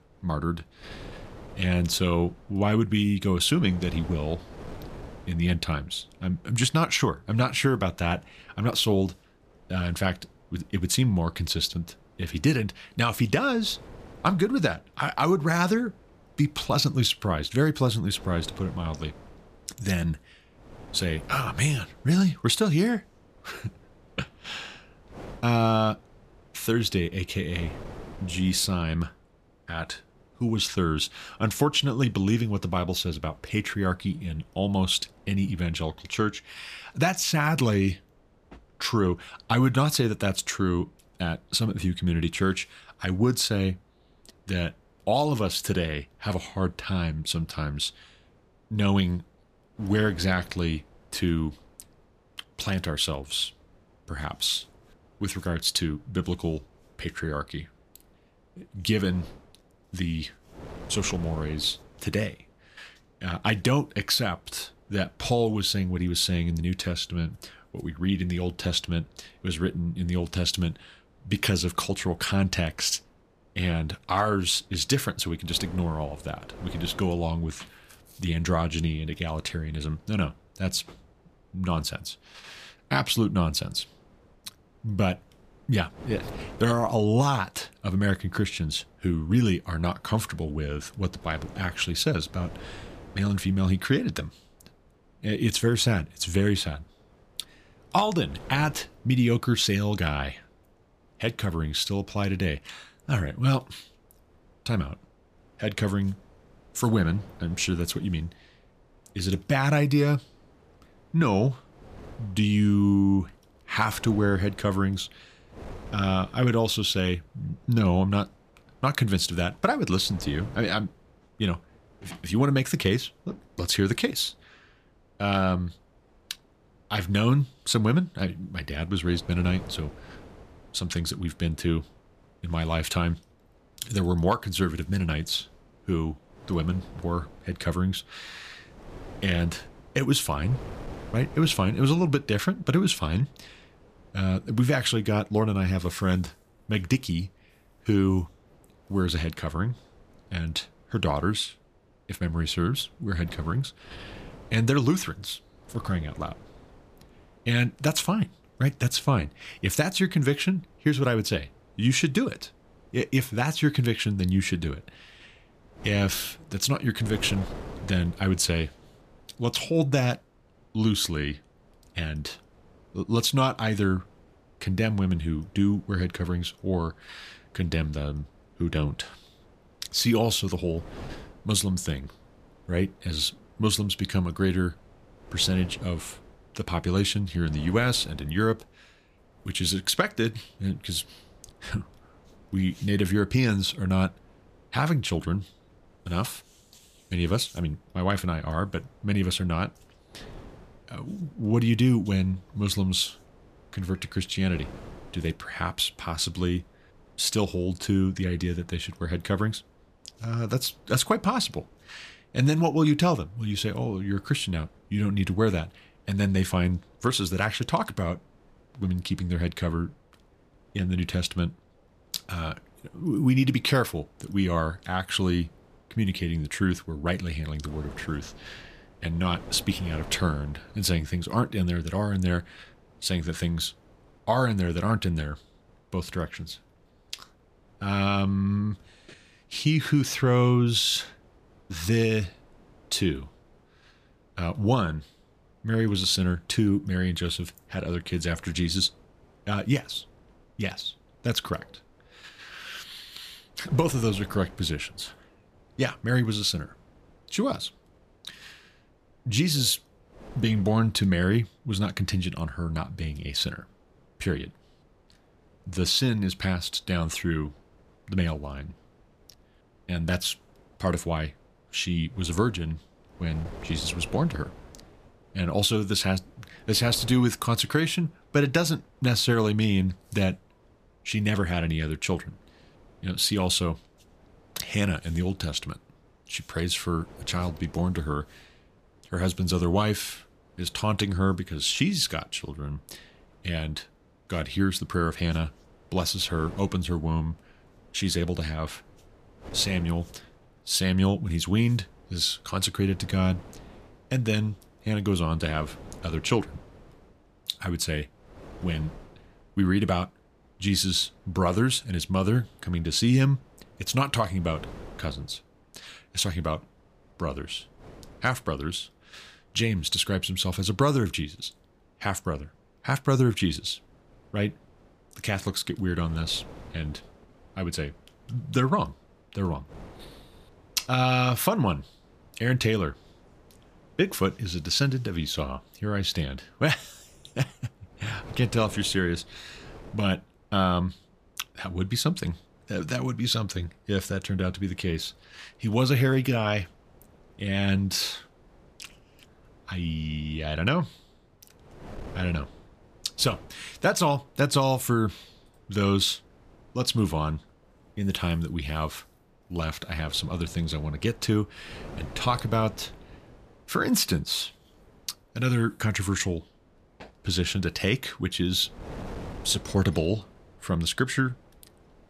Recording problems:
wind noise on the microphone; occasional gusts; 25 dB below the speech

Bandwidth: 14.5 kHz